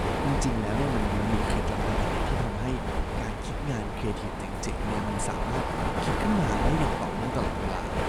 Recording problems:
machinery noise; very loud; throughout; 3 dB above the speech

